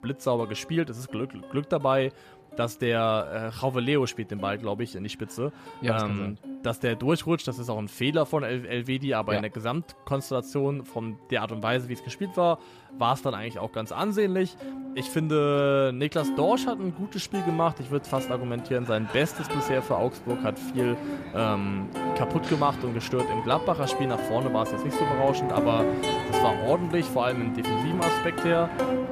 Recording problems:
background music; loud; throughout; 3 dB below the speech

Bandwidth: 14.5 kHz